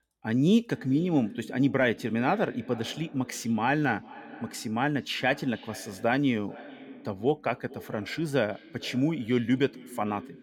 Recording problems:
echo of what is said; faint; throughout; 440 ms later, 20 dB below the speech

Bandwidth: 17.5 kHz